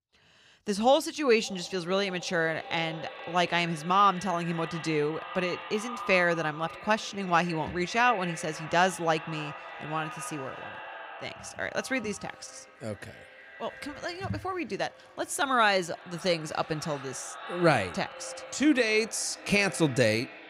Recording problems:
echo of what is said; noticeable; throughout; 570 ms later, 15 dB below the speech

